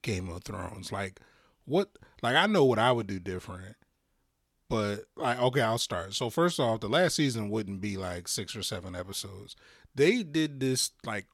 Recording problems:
none

